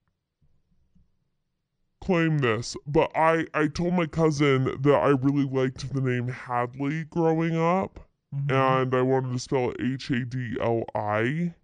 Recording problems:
wrong speed and pitch; too slow and too low; 0.7 times normal speed

